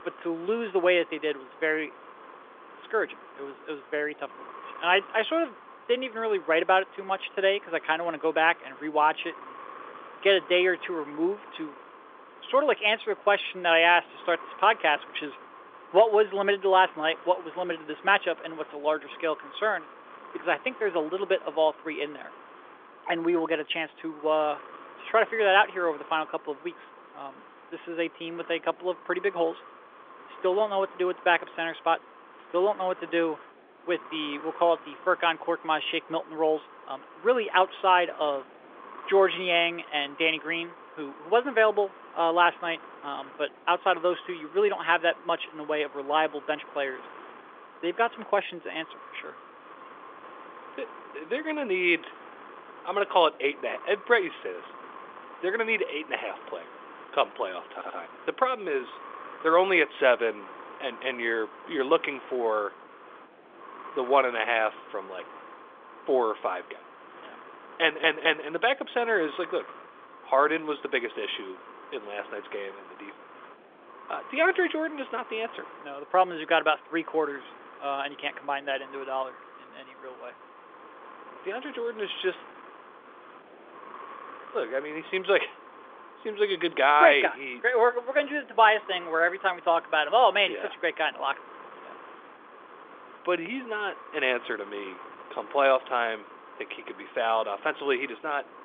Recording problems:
phone-call audio; nothing above 3.5 kHz
wind noise on the microphone; occasional gusts; 20 dB below the speech
audio stuttering; at 58 s and at 1:08

